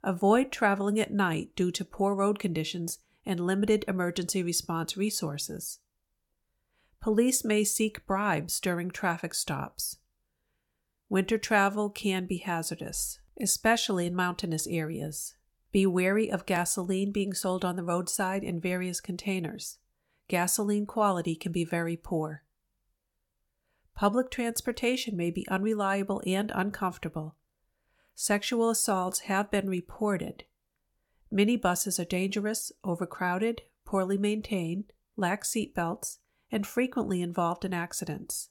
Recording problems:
none

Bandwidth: 17.5 kHz